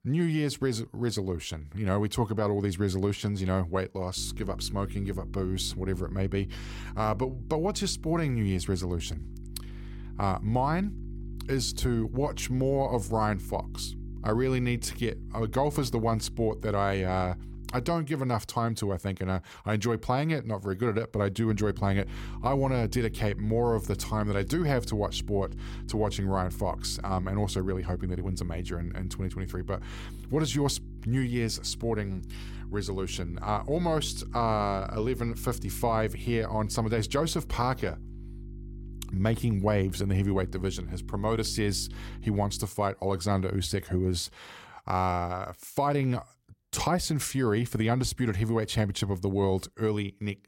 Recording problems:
electrical hum; faint; from 4 to 18 s and from 21 to 43 s; 50 Hz, 20 dB below the speech

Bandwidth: 16.5 kHz